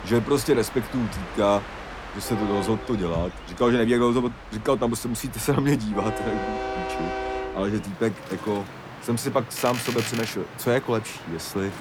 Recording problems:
train or aircraft noise; loud; throughout; 9 dB below the speech

